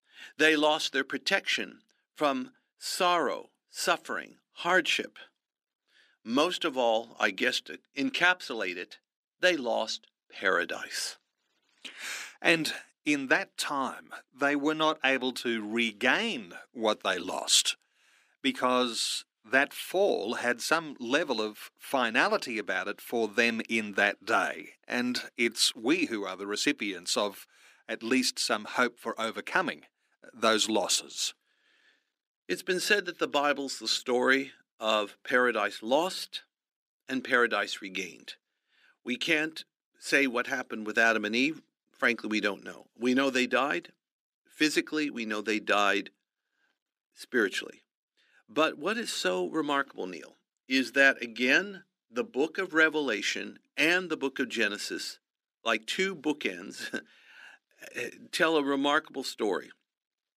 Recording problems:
thin; somewhat; fading below 300 Hz

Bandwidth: 15 kHz